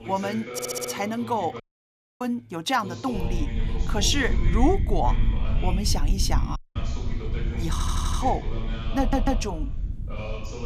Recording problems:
voice in the background; loud; throughout; 9 dB below the speech
low rumble; noticeable; from 3 s on; 15 dB below the speech
audio stuttering; at 0.5 s, at 7.5 s and at 9 s
audio cutting out; at 1.5 s for 0.5 s and at 6.5 s

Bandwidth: 14.5 kHz